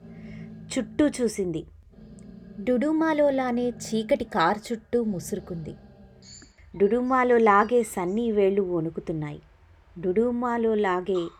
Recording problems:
animal sounds; faint; throughout; 20 dB below the speech

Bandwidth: 17.5 kHz